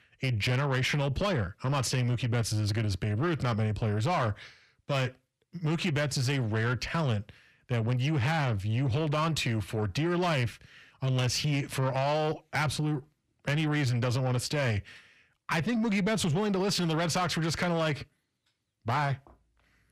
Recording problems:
distortion; slight; 10 dB below the speech

